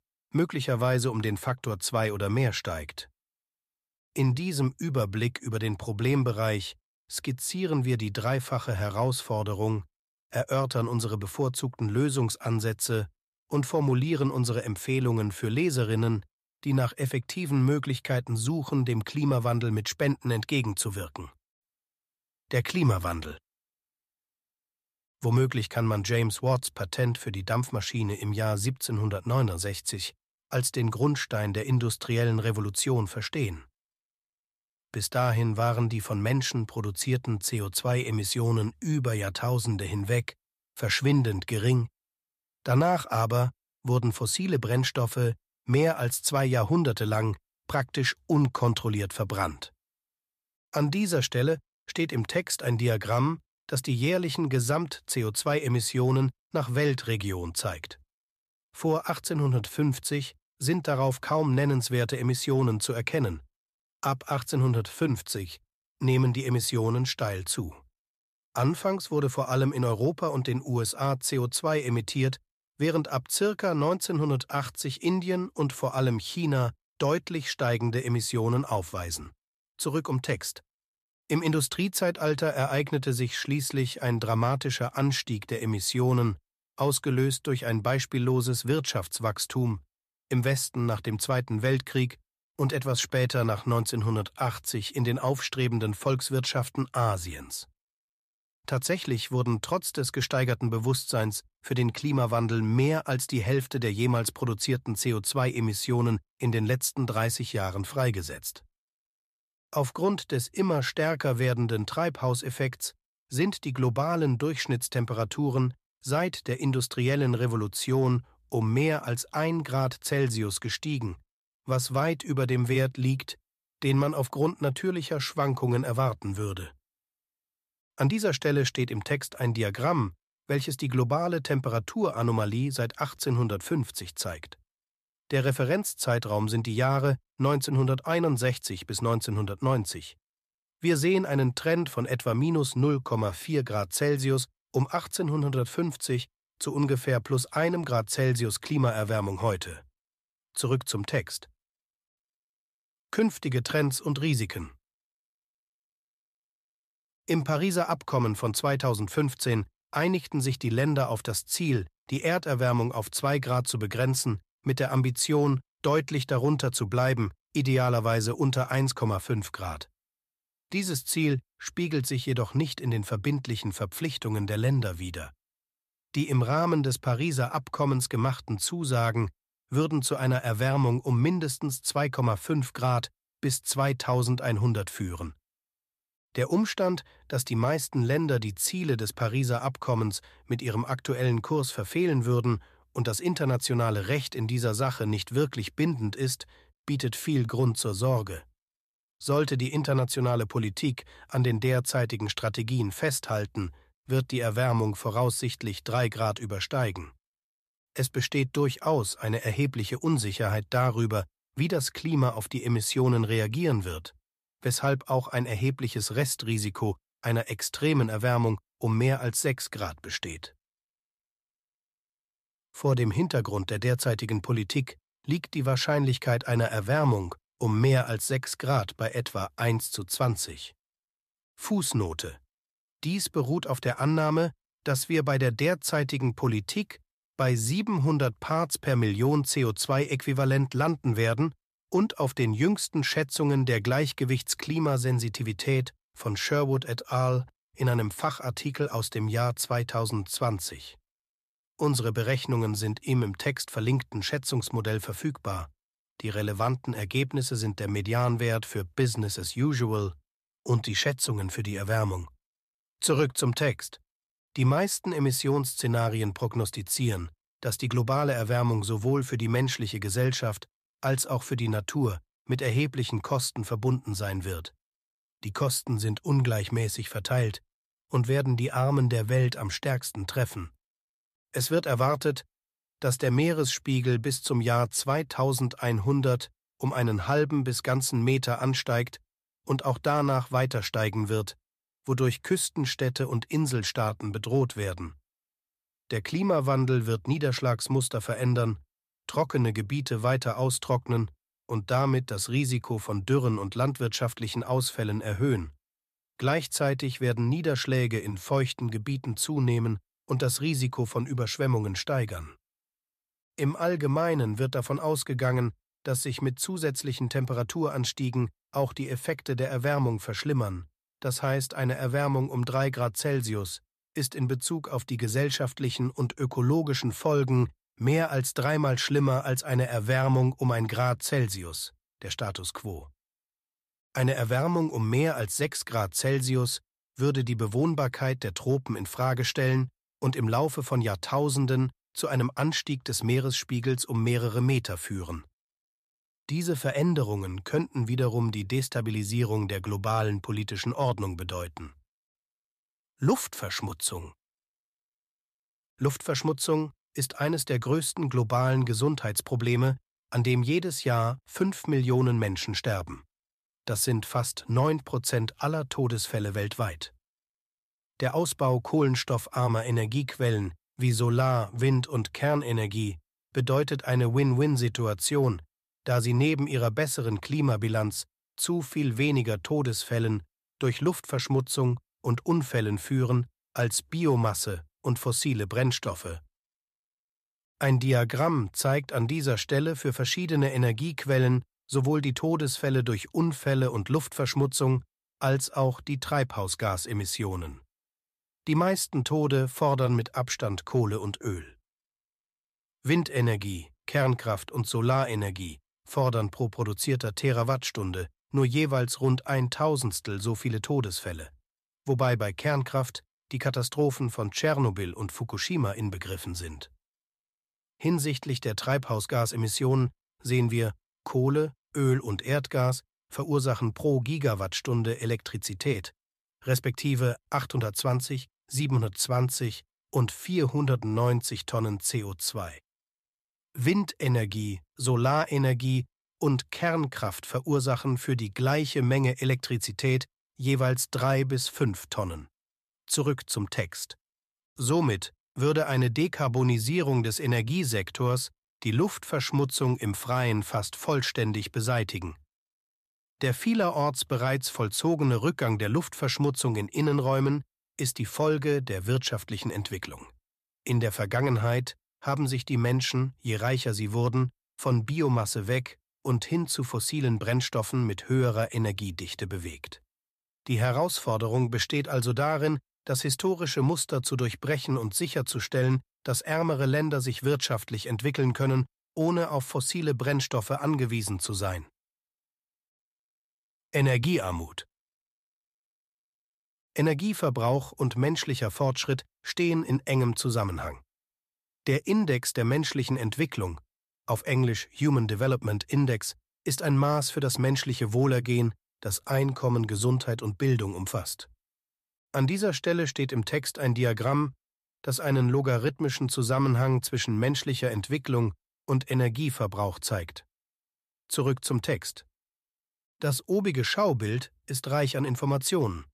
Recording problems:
none

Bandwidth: 14.5 kHz